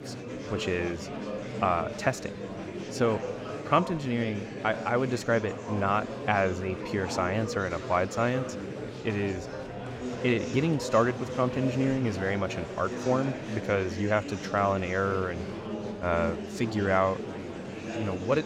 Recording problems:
murmuring crowd; loud; throughout; 7 dB below the speech

